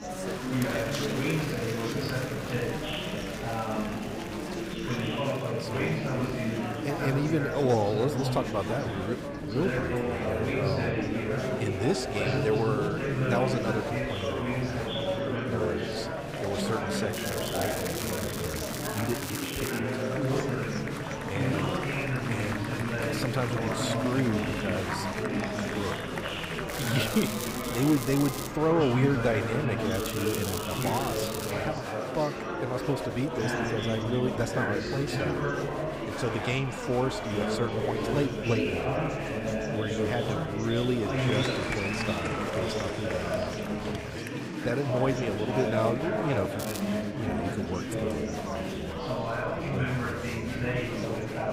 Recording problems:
chatter from many people; very loud; throughout; 2 dB above the speech
crackling; loud; 4 times, first at 17 s; 5 dB below the speech

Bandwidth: 15.5 kHz